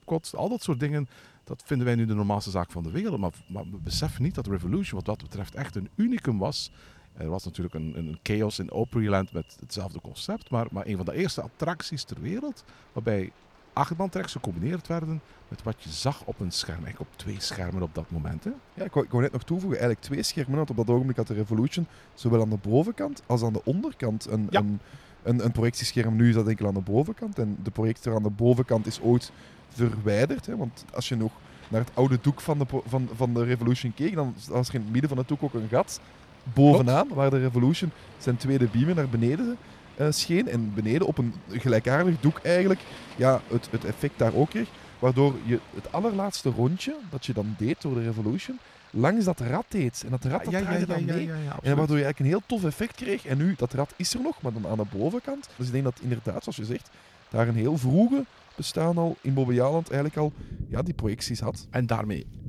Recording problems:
rain or running water; faint; throughout; 20 dB below the speech

